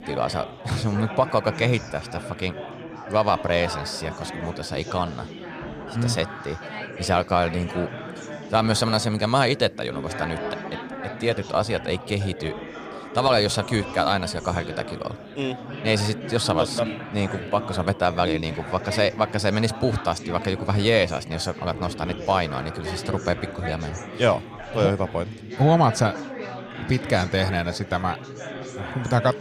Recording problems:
chatter from many people; noticeable; throughout; 10 dB below the speech

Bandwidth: 15 kHz